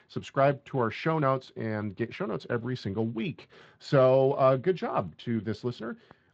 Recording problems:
garbled, watery; slightly; nothing above 7.5 kHz
muffled; very slightly; fading above 3 kHz

